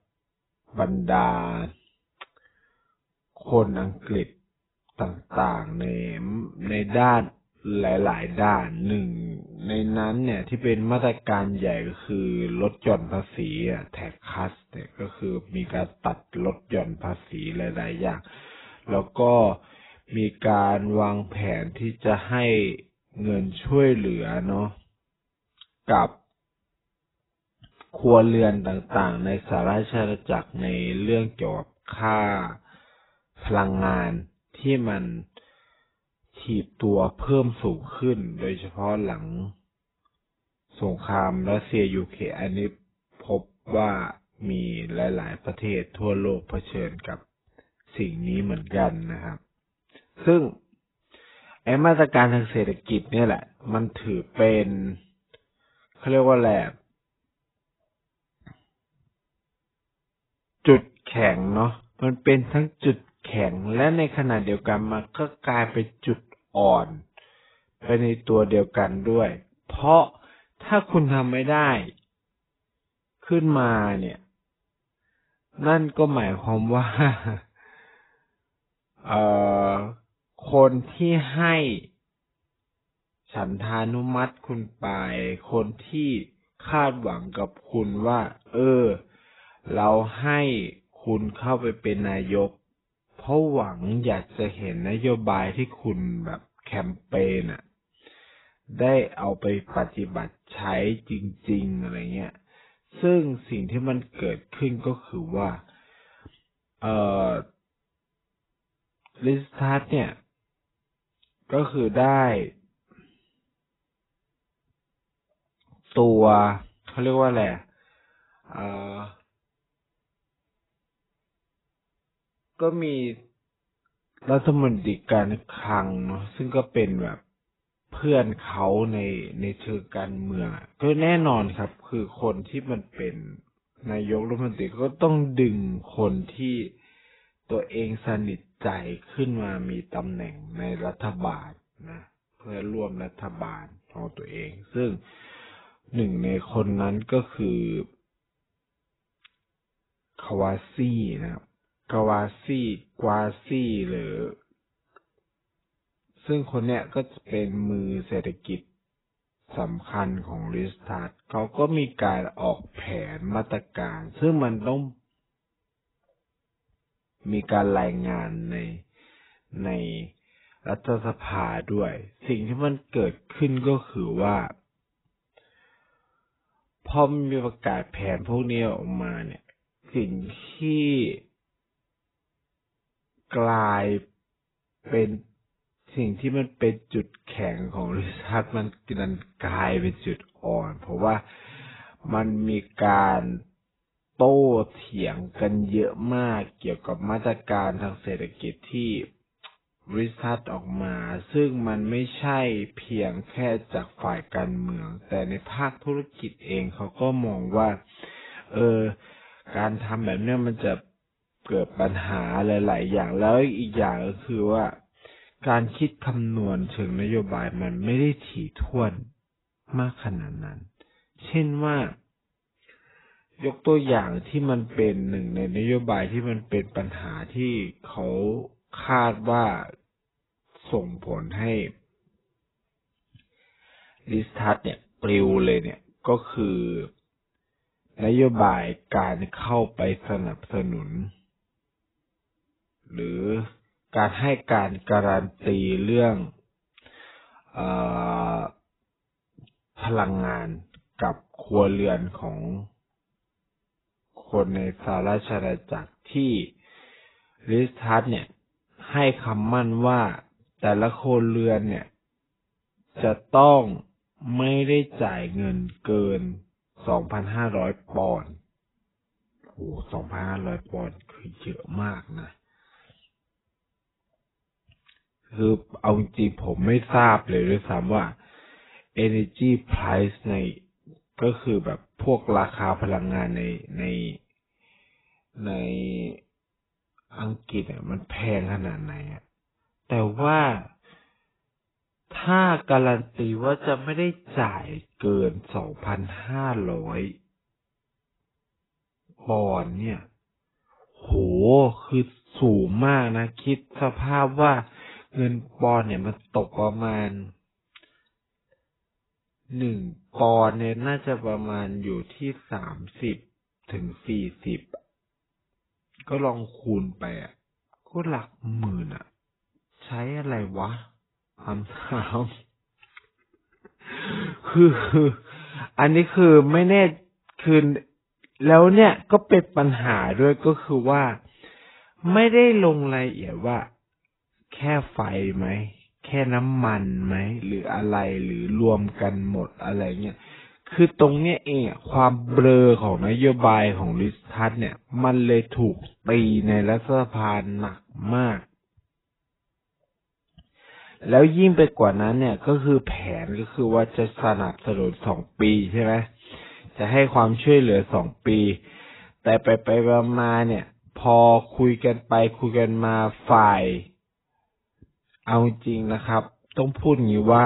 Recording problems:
garbled, watery; badly; nothing above 4 kHz
wrong speed, natural pitch; too slow; 0.7 times normal speed
abrupt cut into speech; at the end

